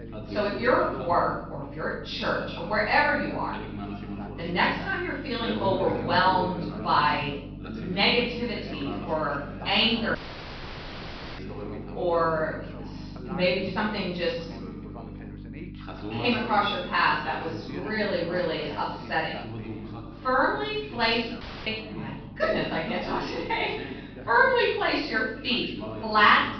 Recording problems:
off-mic speech; far
room echo; noticeable; dies away in 0.7 s
high frequencies cut off; noticeable; nothing above 5.5 kHz
background chatter; noticeable; throughout; 2 voices, 15 dB below the speech
electrical hum; faint; throughout; 50 Hz, 25 dB below the speech
audio cutting out; at 10 s for 1 s and at 21 s

